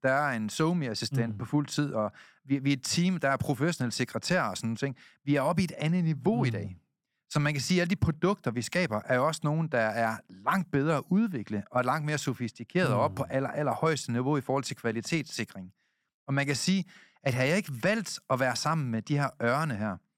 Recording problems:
none

